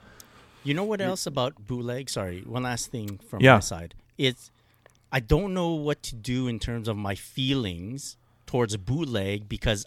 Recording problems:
none

